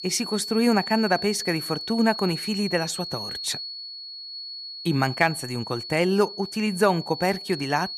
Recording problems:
high-pitched whine; loud; throughout; 4.5 kHz, 8 dB below the speech

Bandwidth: 14.5 kHz